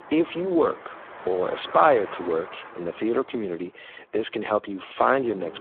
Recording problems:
phone-call audio; poor line
traffic noise; noticeable; throughout; 15 dB below the speech

